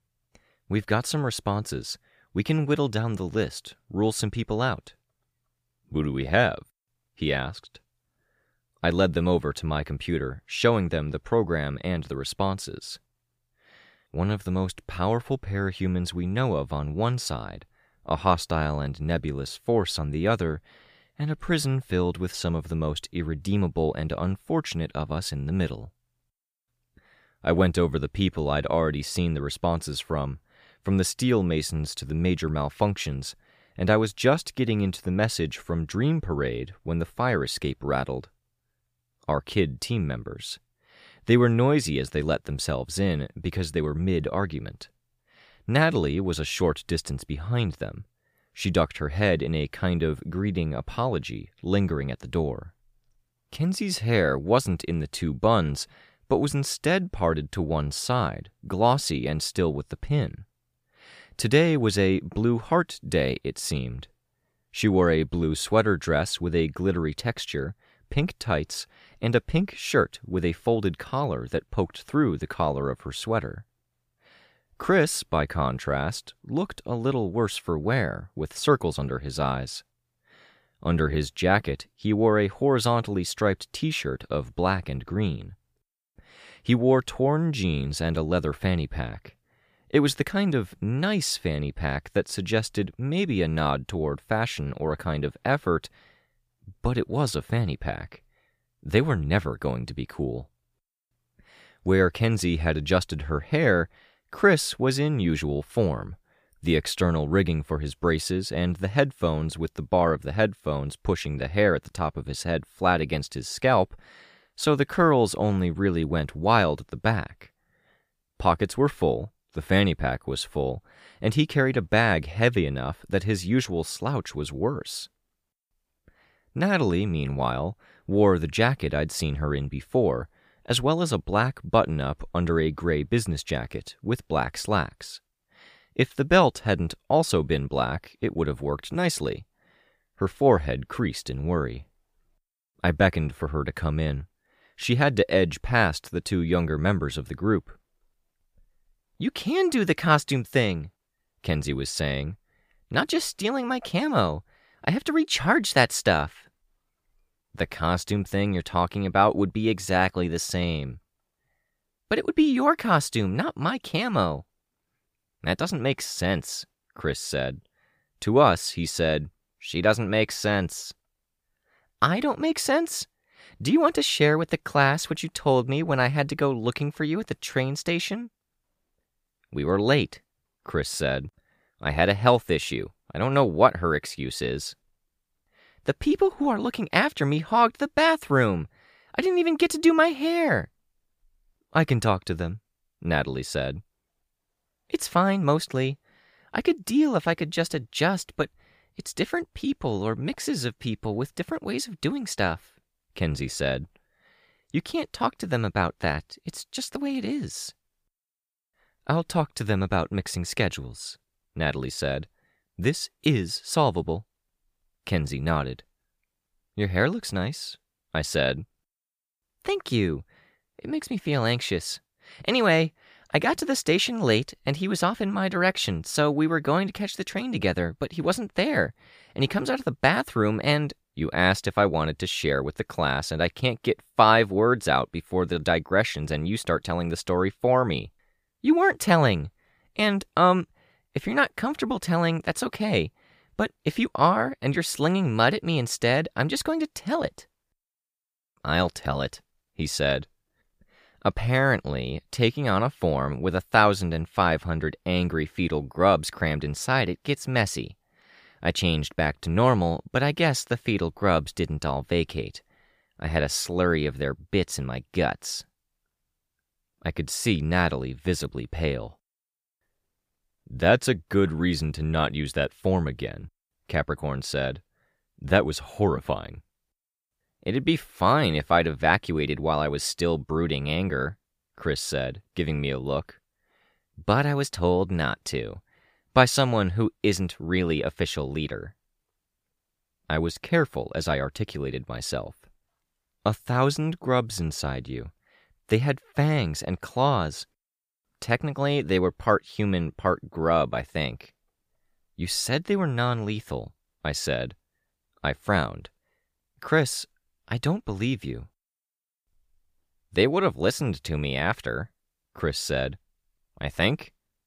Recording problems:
none

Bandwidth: 15 kHz